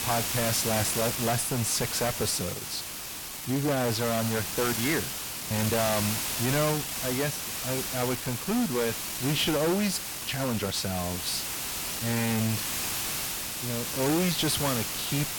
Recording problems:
distortion; heavy; 13% of the sound clipped
hiss; loud; throughout; 2 dB below the speech
uneven, jittery; strongly; from 0.5 to 14 s

